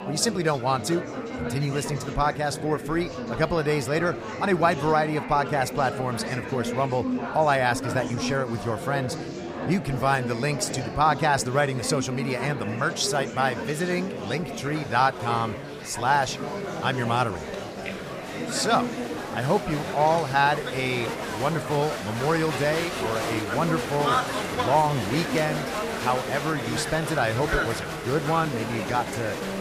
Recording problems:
murmuring crowd; loud; throughout; 5 dB below the speech

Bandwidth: 15 kHz